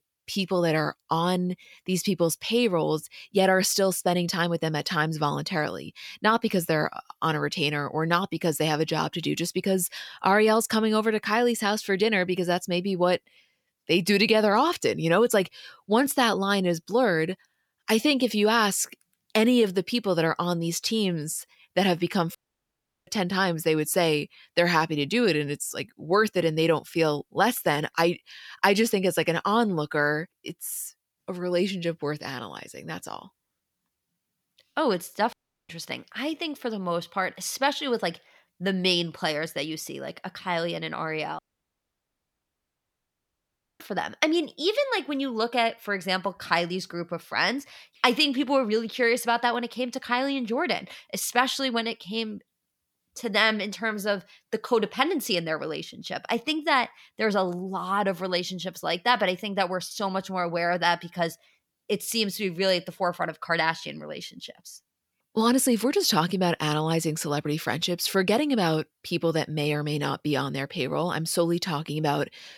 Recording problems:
audio cutting out; at 22 s for 0.5 s, at 35 s and at 41 s for 2.5 s

